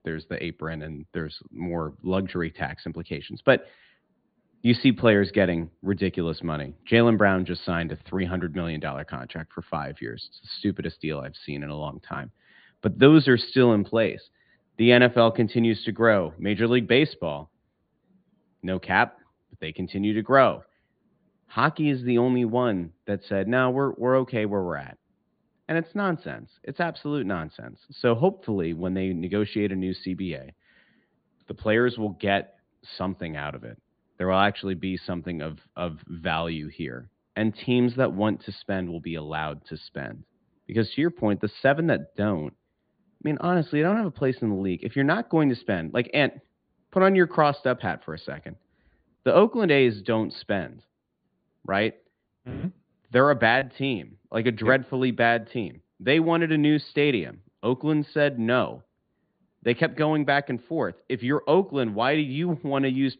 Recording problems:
high frequencies cut off; severe; nothing above 4.5 kHz

